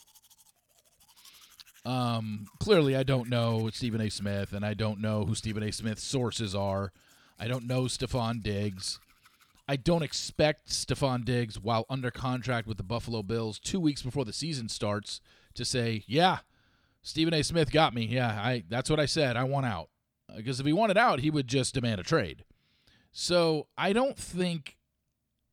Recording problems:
household noises; faint; until 16 s; 30 dB below the speech

